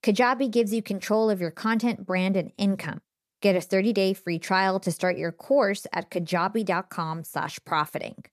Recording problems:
none

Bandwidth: 14.5 kHz